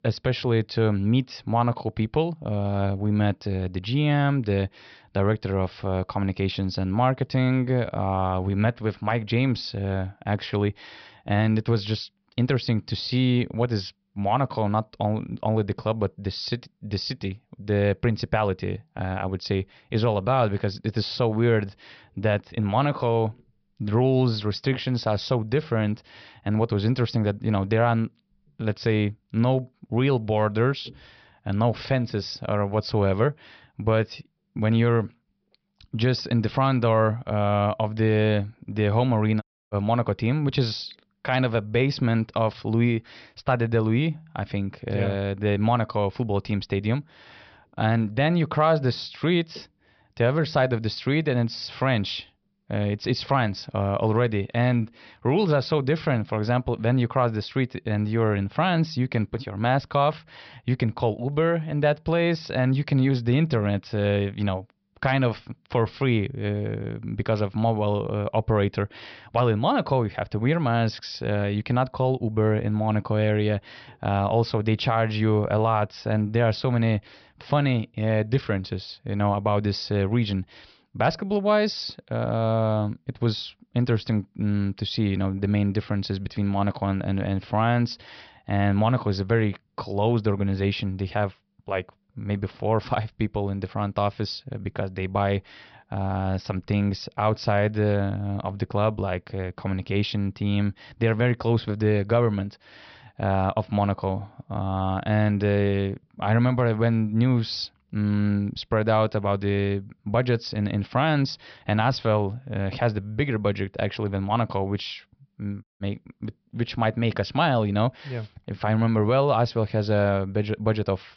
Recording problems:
high frequencies cut off; noticeable; nothing above 5.5 kHz
audio cutting out; at 39 s and at 1:56

